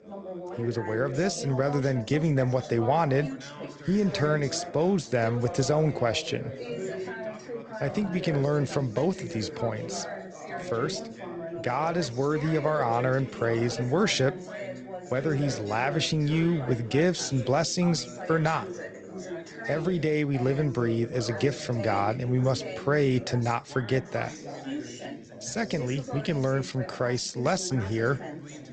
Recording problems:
garbled, watery; slightly; nothing above 8 kHz
background chatter; noticeable; throughout; 3 voices, 10 dB below the speech

